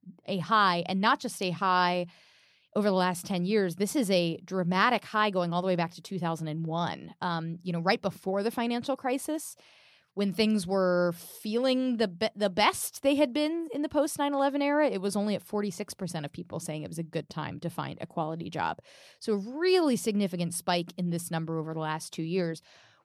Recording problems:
none

